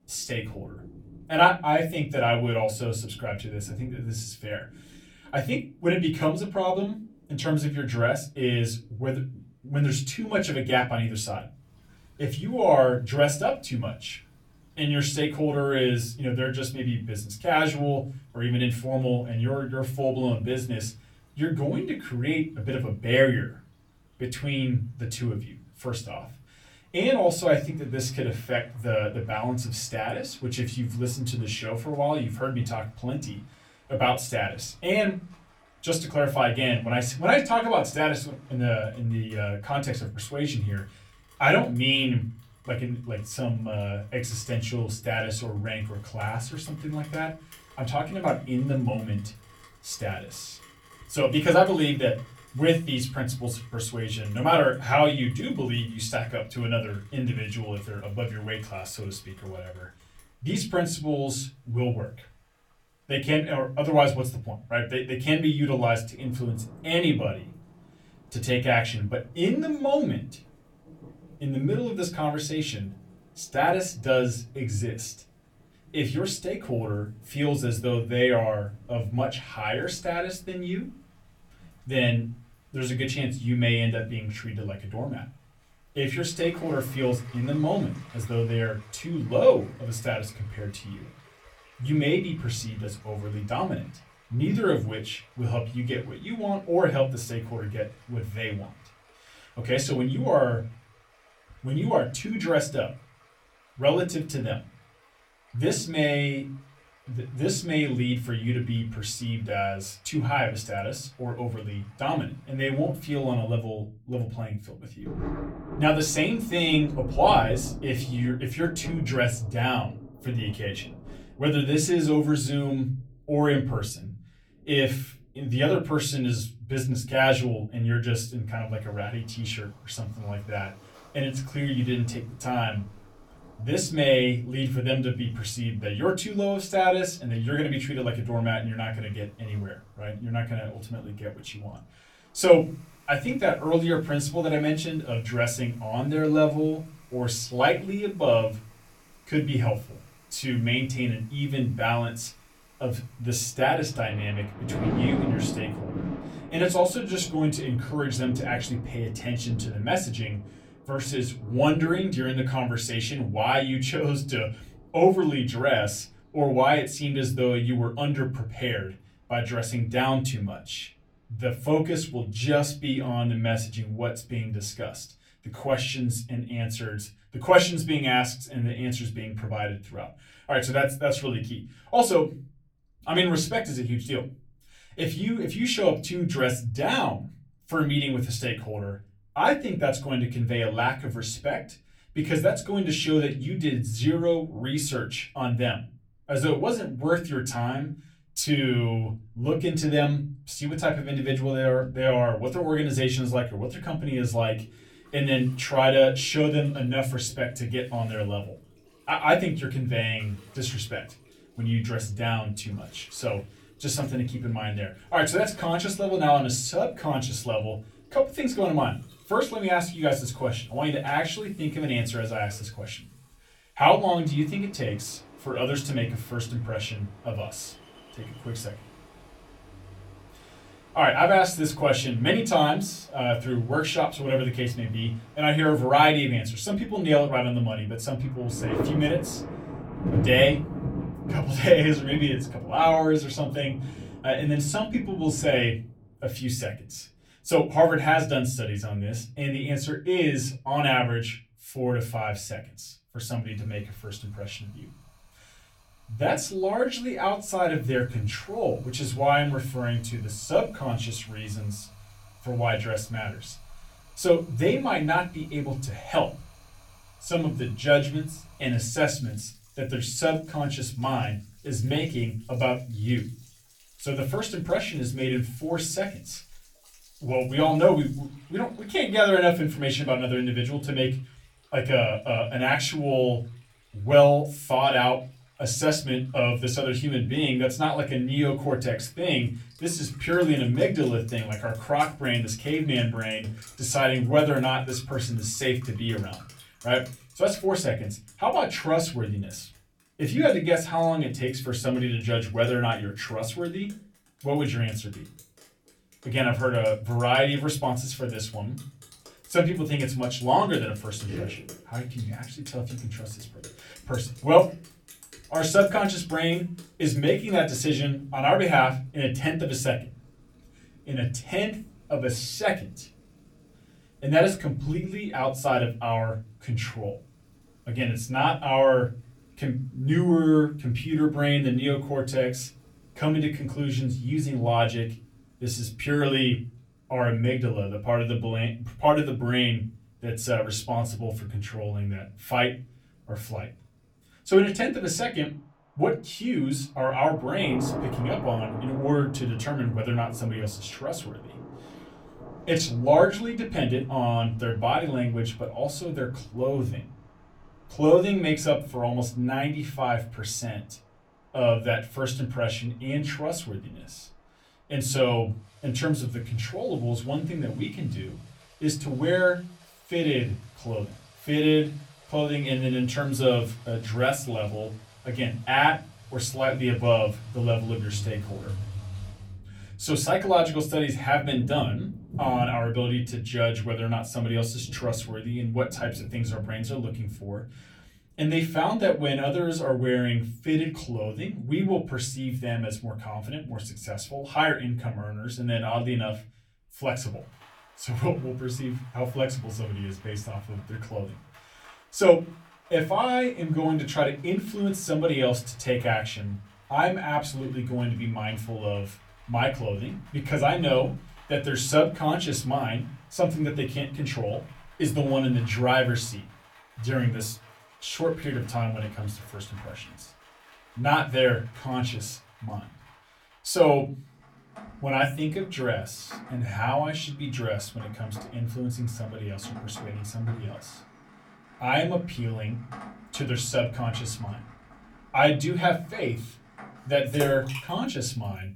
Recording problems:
off-mic speech; far
room echo; very slight; dies away in 0.4 s
rain or running water; noticeable; throughout; 20 dB below the speech

